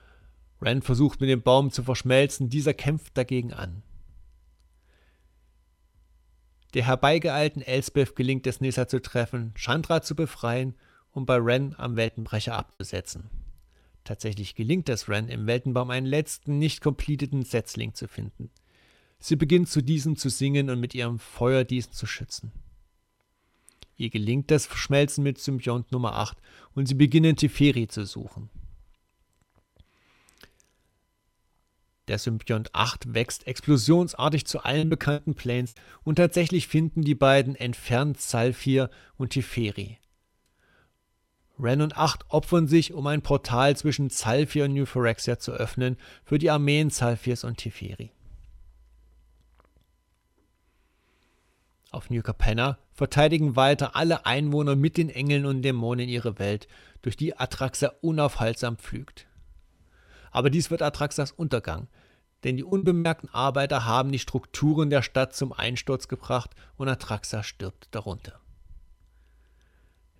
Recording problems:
choppy; very; at 12 s, at 35 s and at 1:03; 10% of the speech affected

